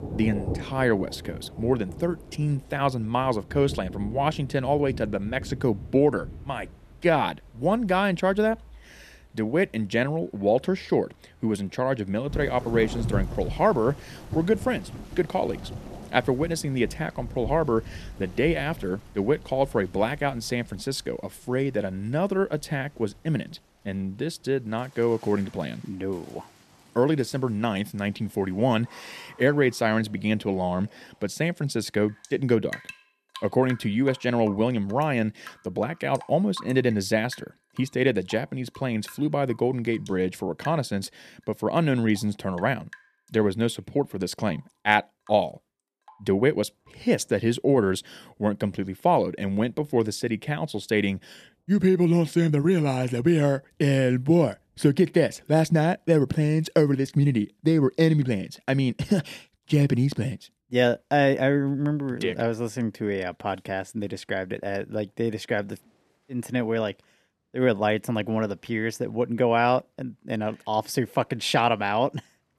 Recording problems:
rain or running water; noticeable; throughout; 15 dB below the speech

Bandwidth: 13.5 kHz